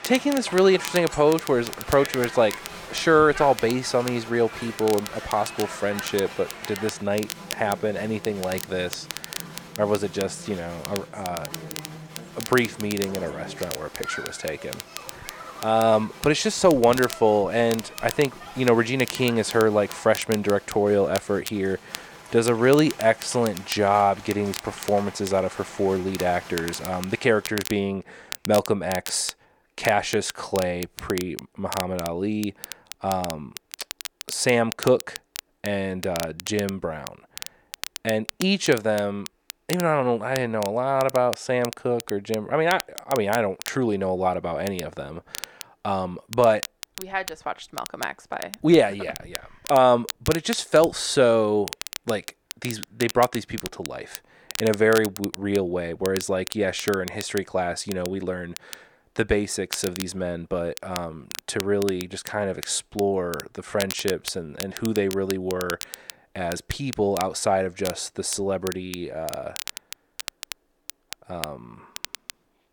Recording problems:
crowd noise; noticeable; until 27 s; 15 dB below the speech
crackle, like an old record; noticeable; 15 dB below the speech

